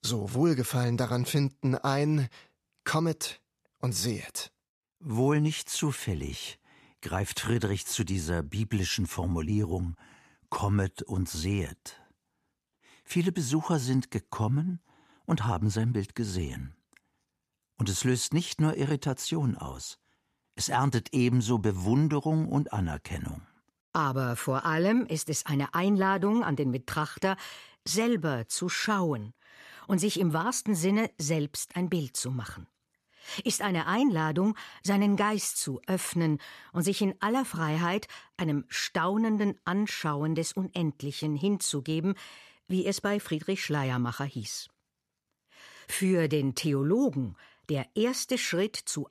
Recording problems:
none

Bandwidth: 14 kHz